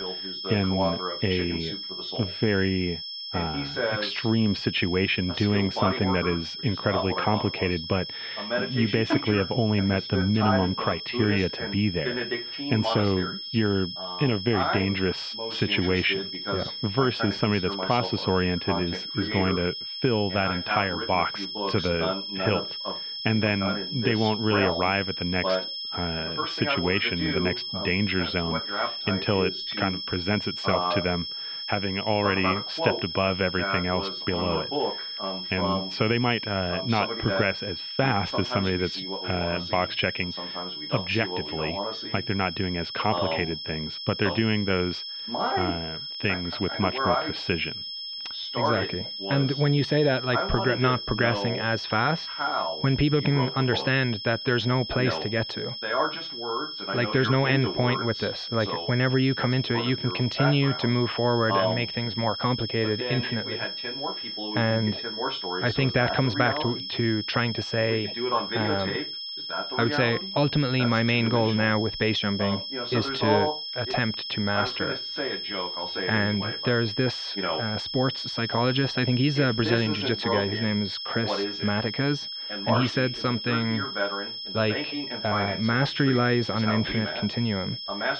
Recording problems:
muffled; very; fading above 3 kHz
high-pitched whine; loud; throughout; 5.5 kHz, 6 dB below the speech
voice in the background; loud; throughout; 6 dB below the speech

